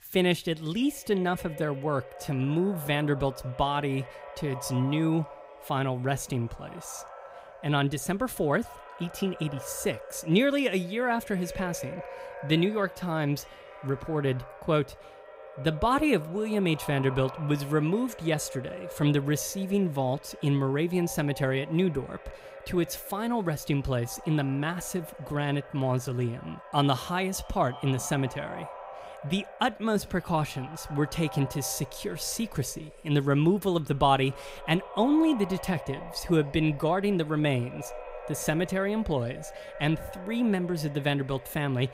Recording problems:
echo of what is said; noticeable; throughout; 270 ms later, 15 dB below the speech

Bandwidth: 15.5 kHz